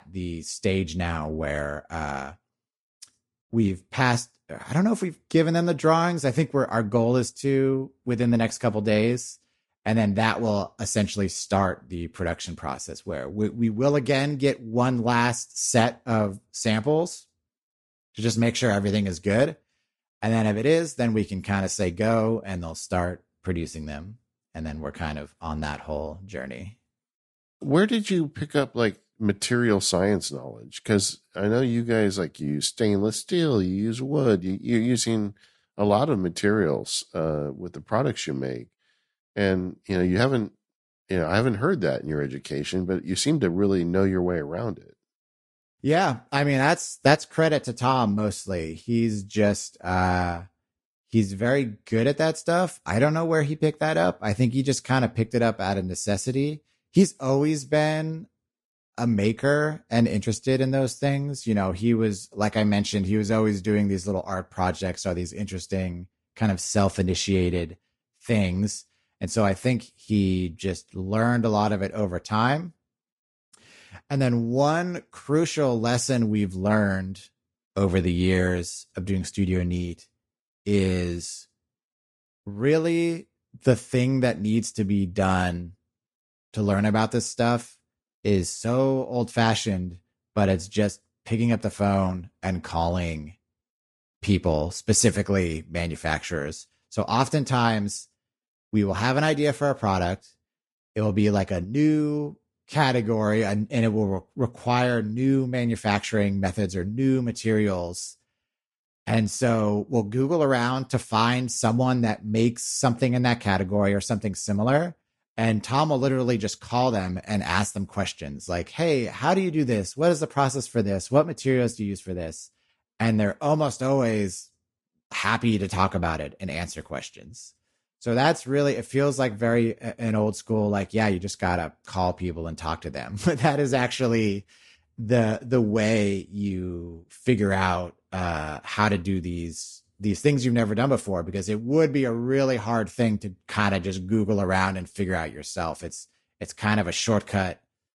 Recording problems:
garbled, watery; slightly; nothing above 10.5 kHz

